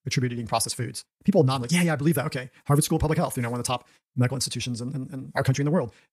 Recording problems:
wrong speed, natural pitch; too fast; 1.5 times normal speed

